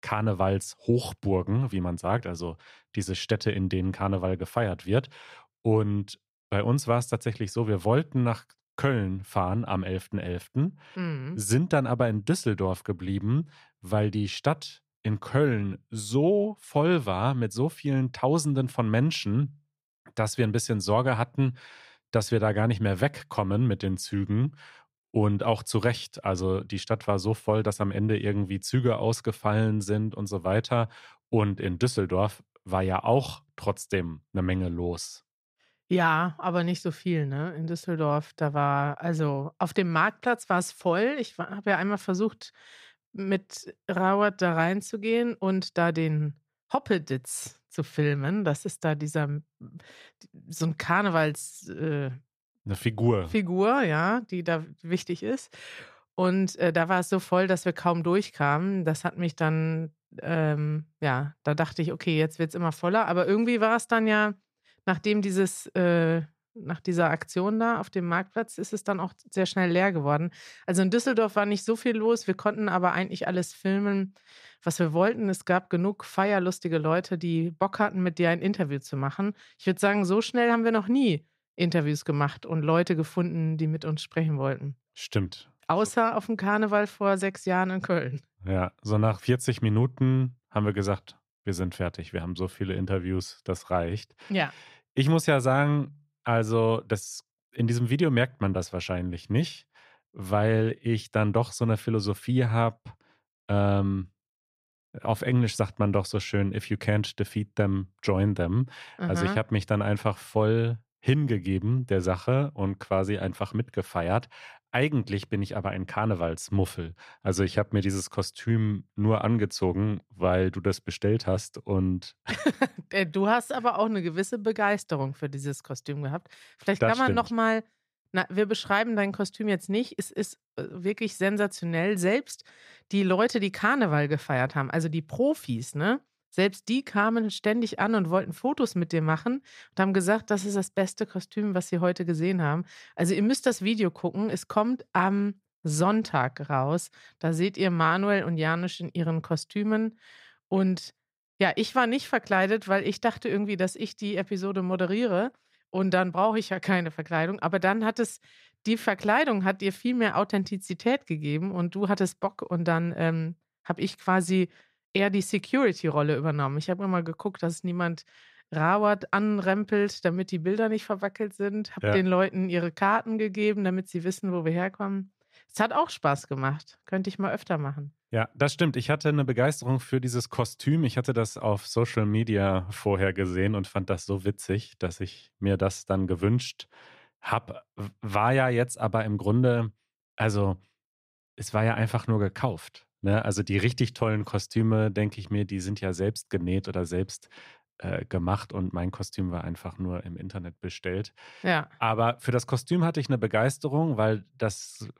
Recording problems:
none

